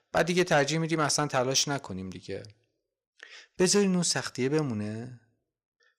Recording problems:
distortion; slight; 10 dB below the speech

